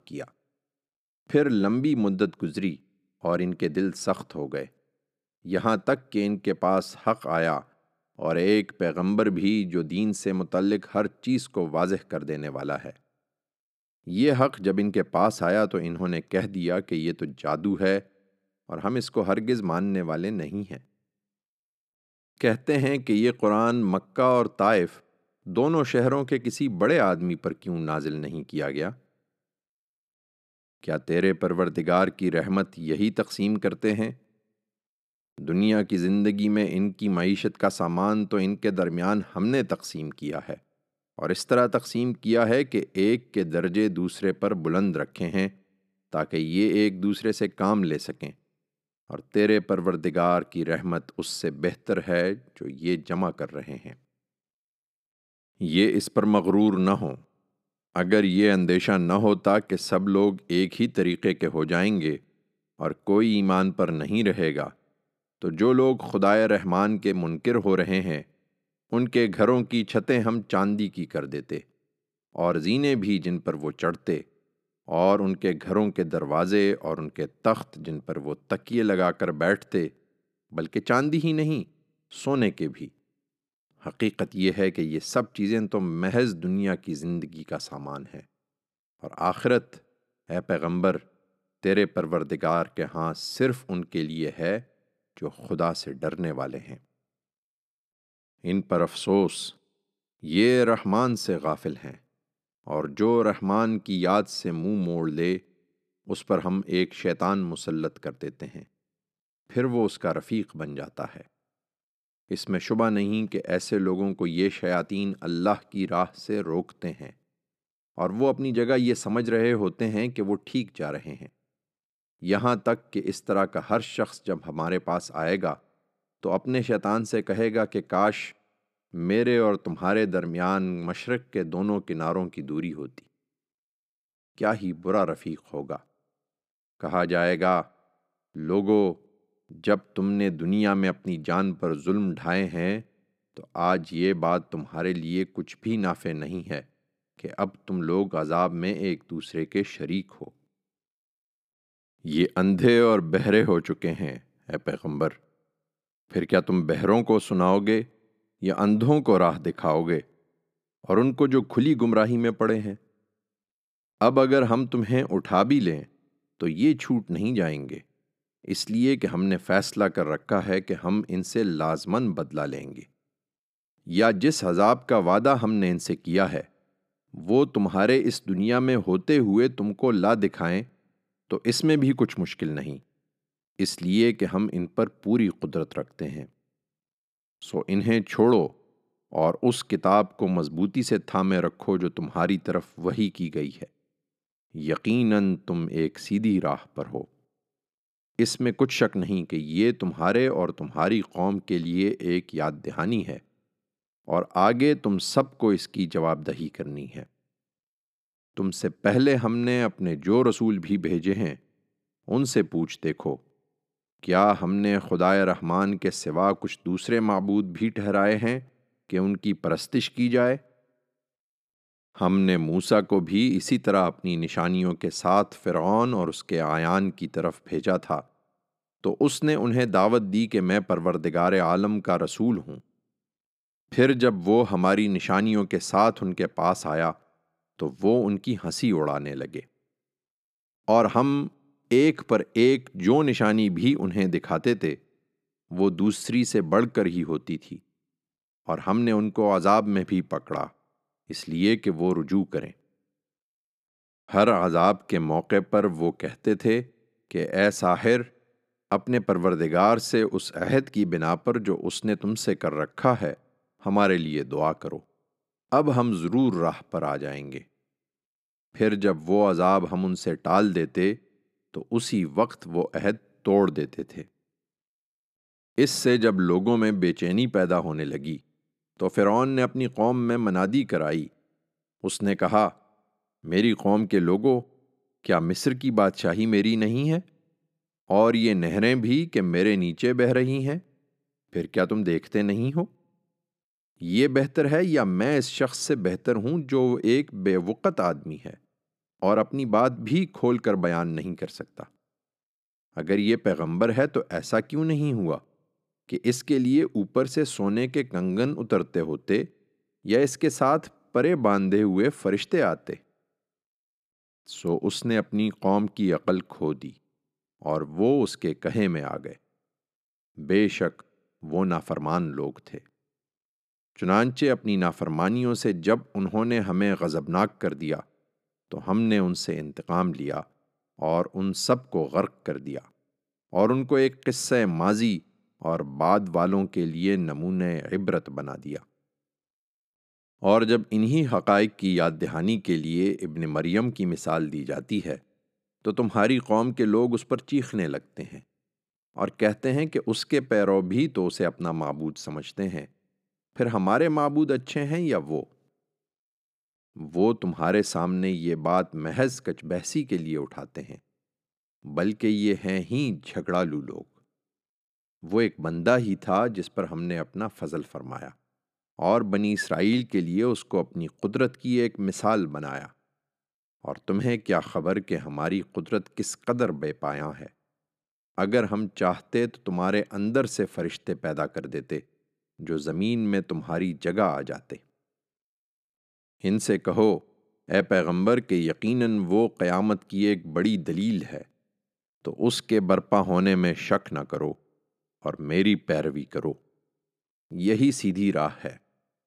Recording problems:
none

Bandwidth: 14.5 kHz